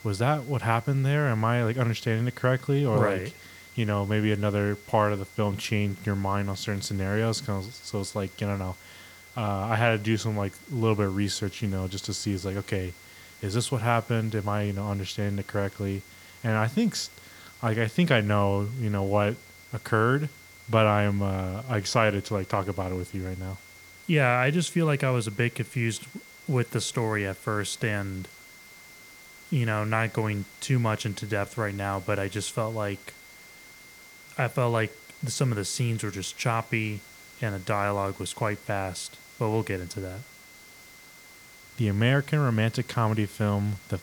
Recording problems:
high-pitched whine; faint; throughout; 2 kHz, 25 dB below the speech
hiss; faint; throughout; 20 dB below the speech

